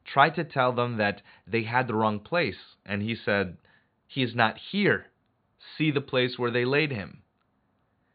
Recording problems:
high frequencies cut off; severe; nothing above 4.5 kHz

